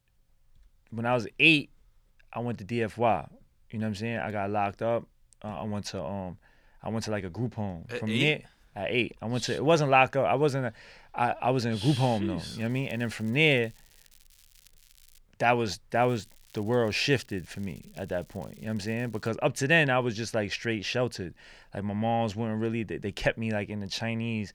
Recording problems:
crackling; faint; from 13 to 15 s and from 16 to 19 s; 30 dB below the speech

